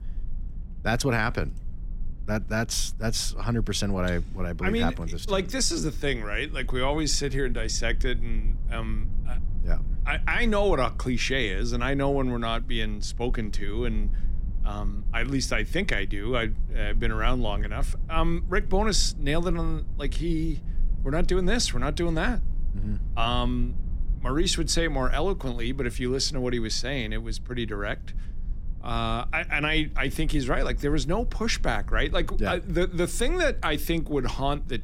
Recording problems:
low rumble; faint; throughout; 25 dB below the speech

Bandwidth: 16 kHz